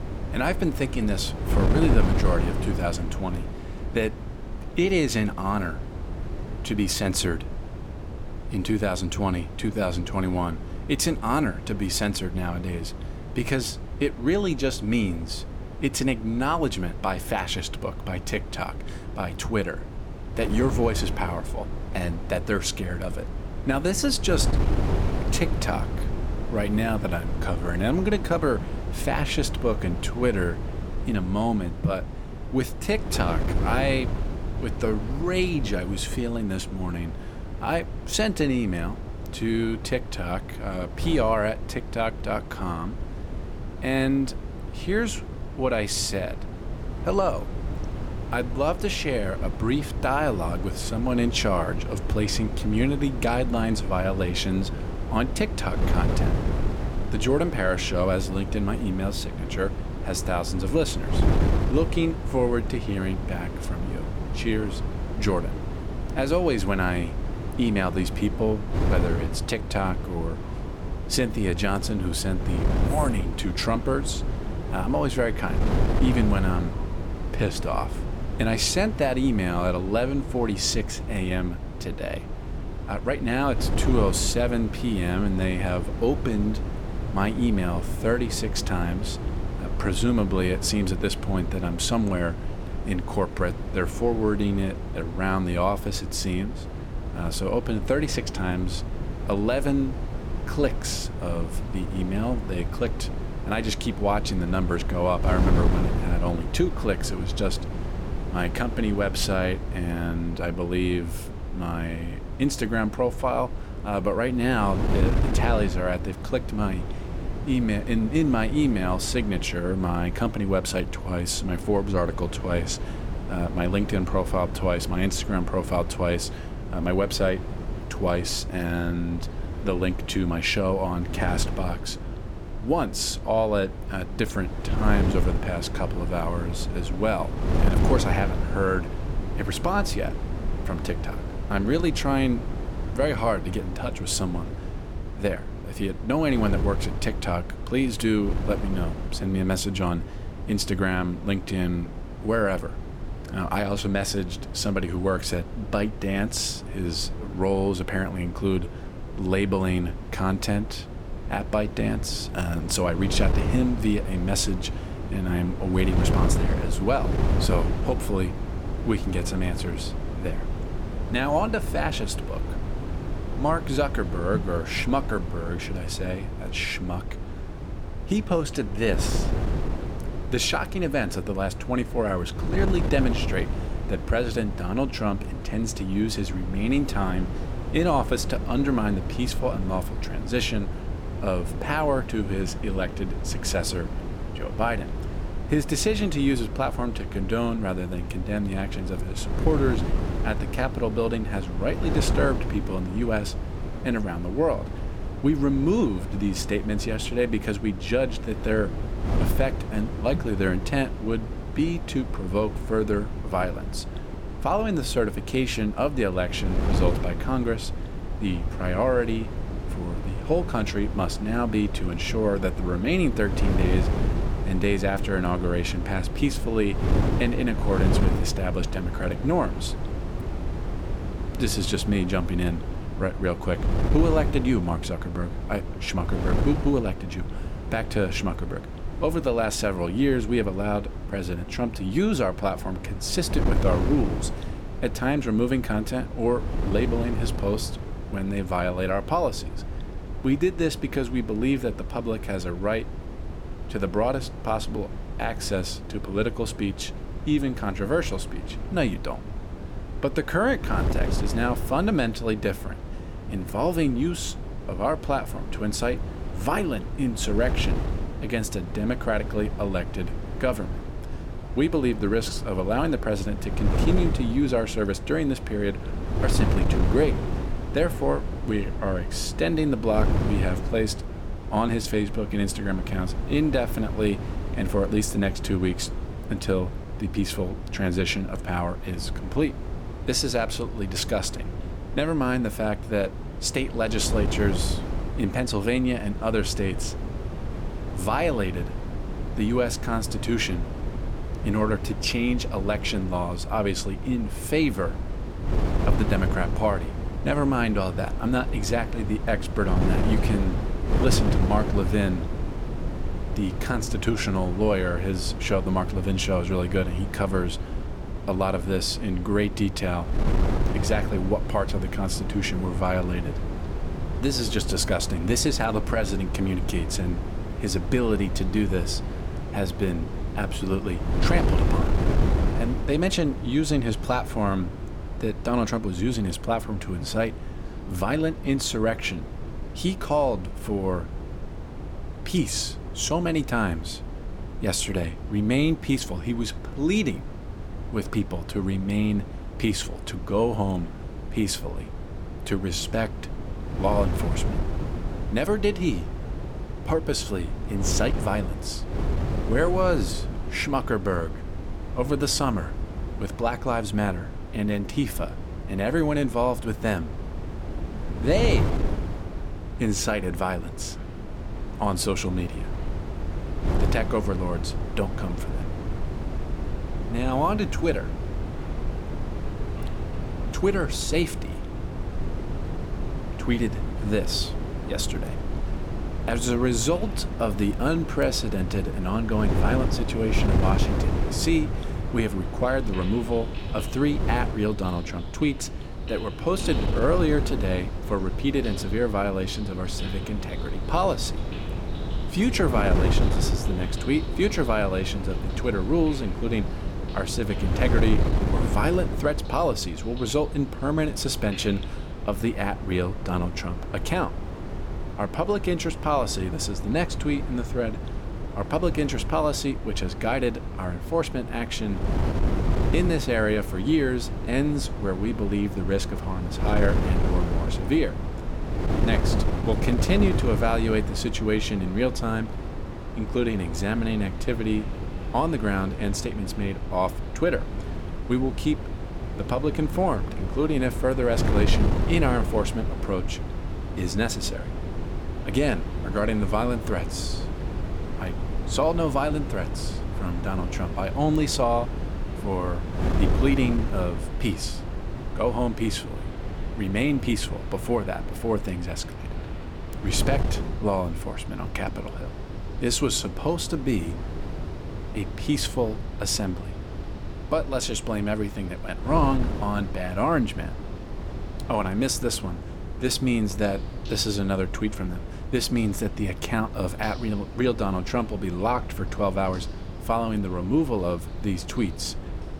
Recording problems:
wind noise on the microphone; heavy; 10 dB below the speech
rain or running water; faint; throughout; 25 dB below the speech

